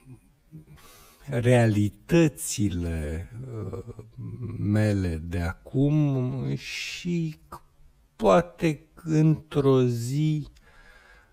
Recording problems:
wrong speed, natural pitch; too slow; 0.6 times normal speed

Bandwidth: 15.5 kHz